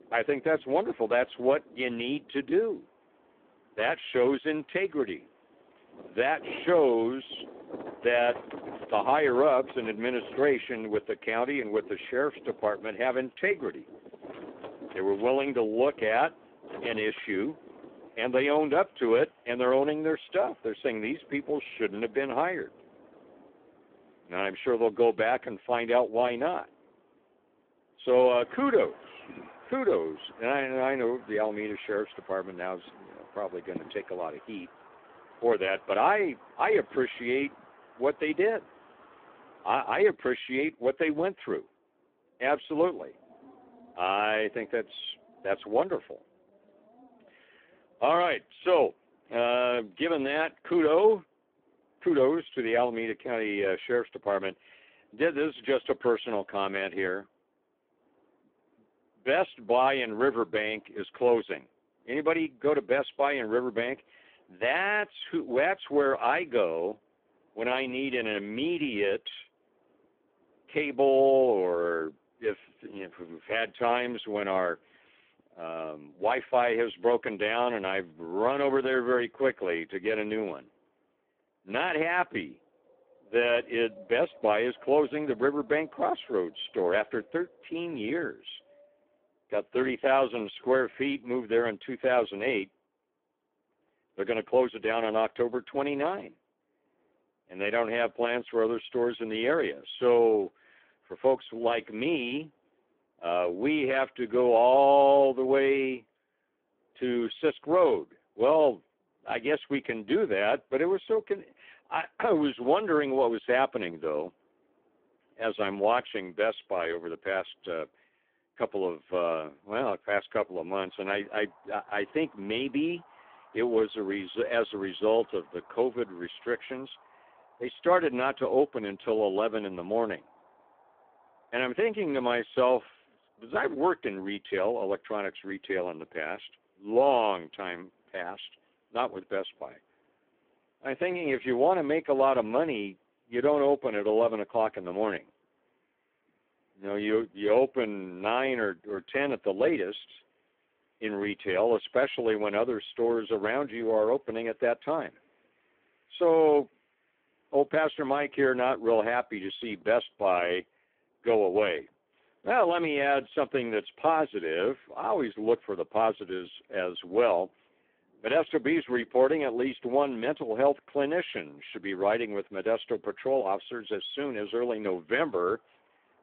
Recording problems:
phone-call audio; poor line
wind in the background; faint; throughout; 25 dB below the speech

